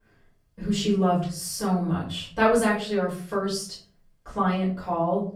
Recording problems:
off-mic speech; far
room echo; slight; dies away in 0.5 s

